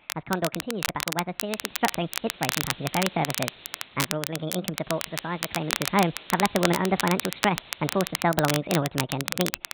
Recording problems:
high frequencies cut off; severe; nothing above 4 kHz
wrong speed and pitch; too fast and too high; 1.5 times normal speed
crackle, like an old record; loud; 3 dB below the speech
hiss; noticeable; from 1.5 to 4 s and from 5 to 8 s; 20 dB below the speech

